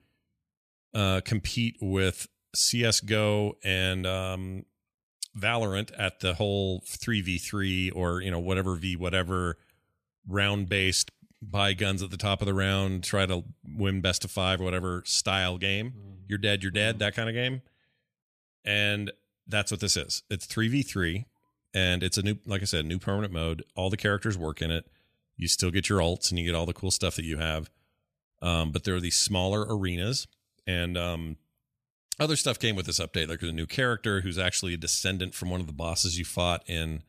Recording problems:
none

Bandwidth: 14.5 kHz